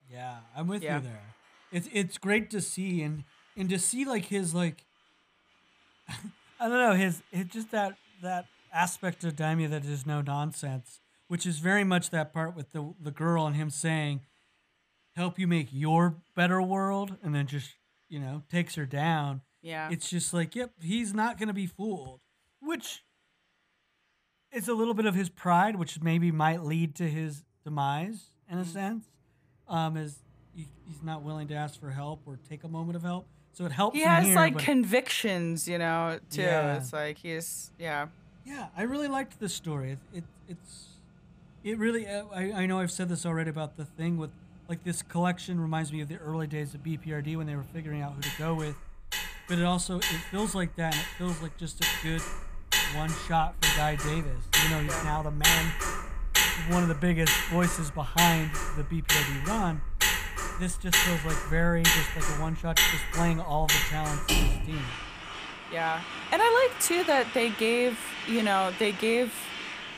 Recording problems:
traffic noise; very loud; throughout; 1 dB above the speech

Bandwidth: 15 kHz